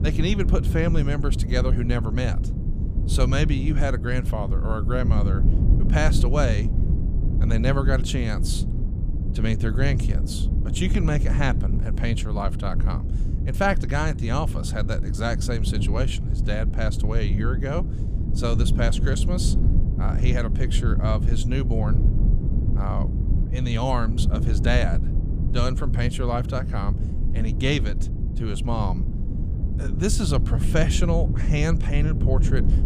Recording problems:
low rumble; loud; throughout; 8 dB below the speech

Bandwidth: 15 kHz